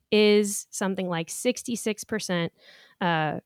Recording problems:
none

